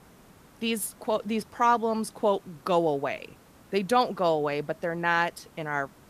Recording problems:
hiss; faint; throughout; 25 dB below the speech

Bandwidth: 14.5 kHz